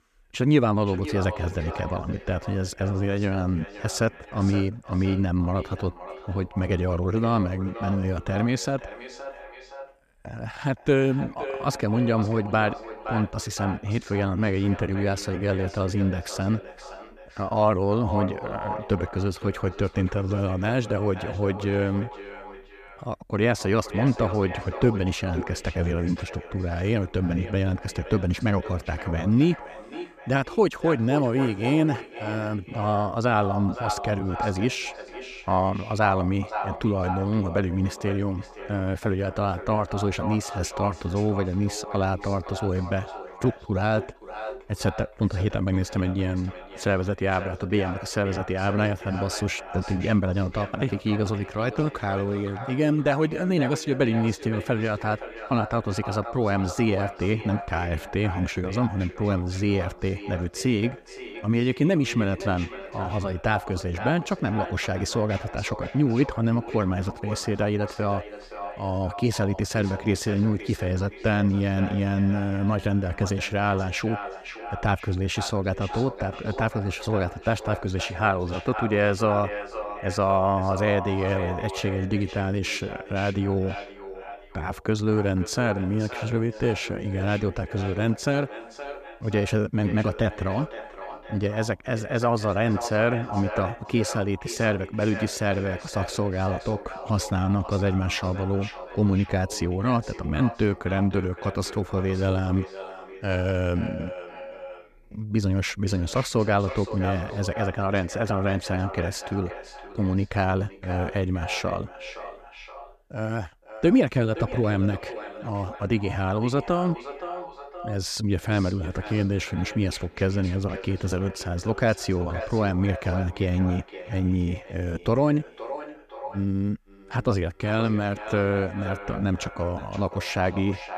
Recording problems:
echo of what is said; noticeable; throughout; 520 ms later, 10 dB below the speech

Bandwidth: 14.5 kHz